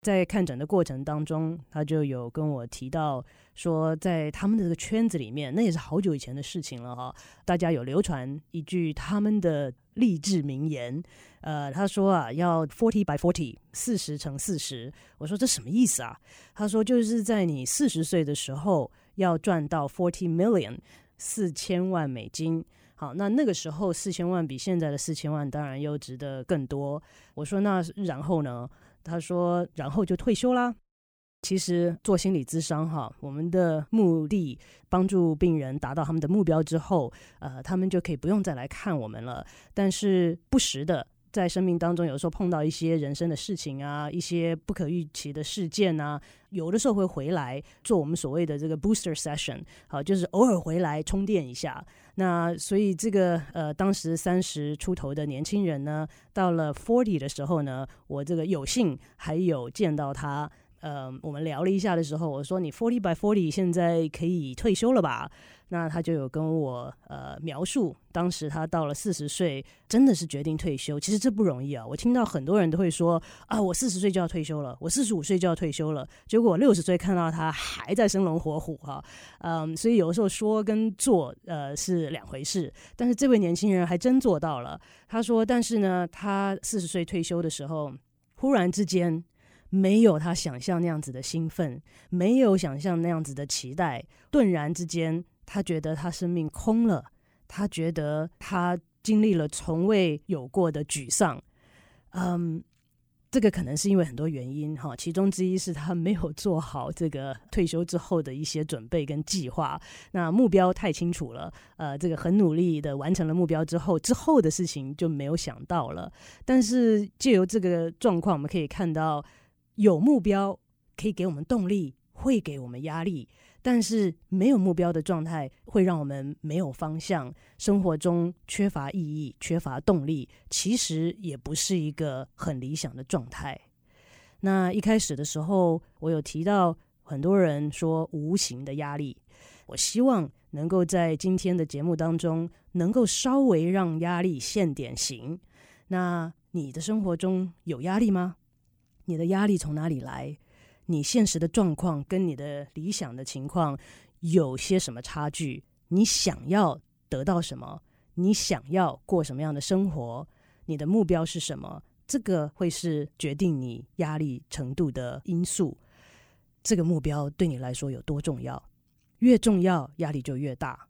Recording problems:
uneven, jittery; strongly; from 13 s to 2:35

